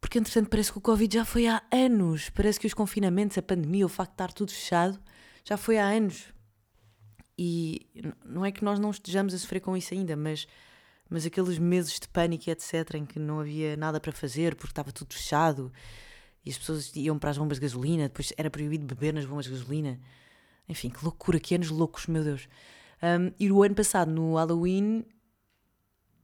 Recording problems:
none

